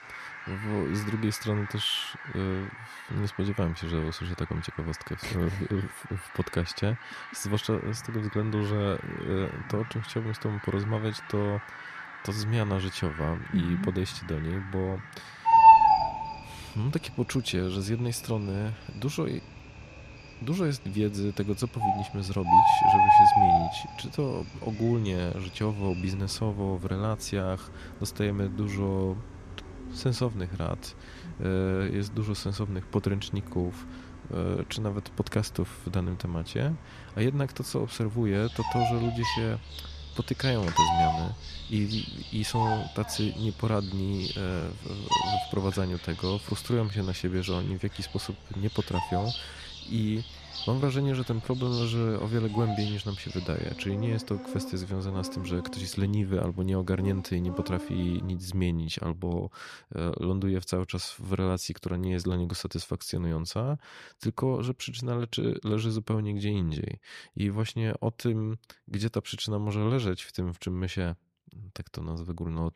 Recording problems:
animal sounds; very loud; until 58 s; 4 dB above the speech

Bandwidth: 14.5 kHz